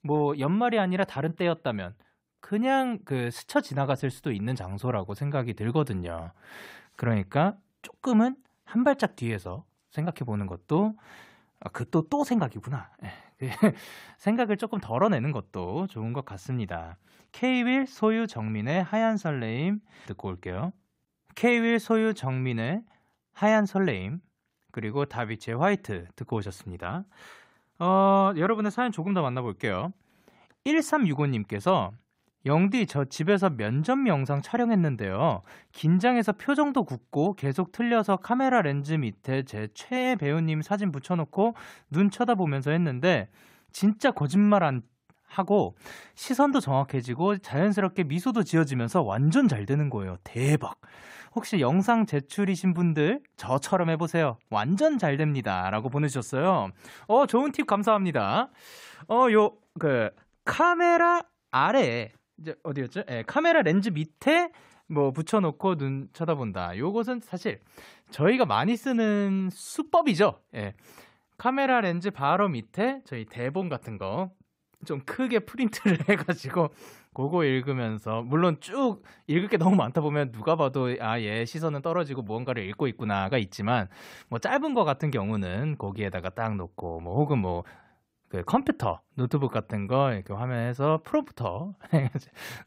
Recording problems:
none

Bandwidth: 15.5 kHz